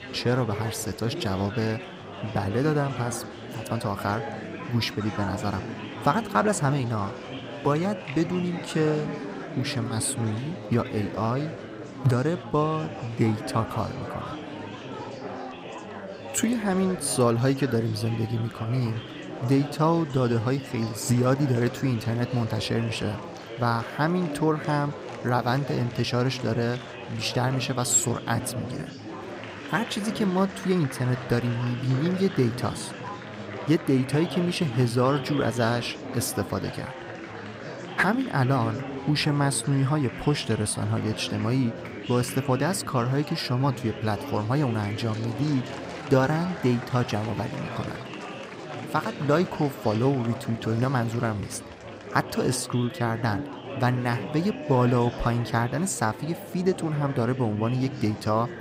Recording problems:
murmuring crowd; noticeable; throughout; 10 dB below the speech

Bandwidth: 15.5 kHz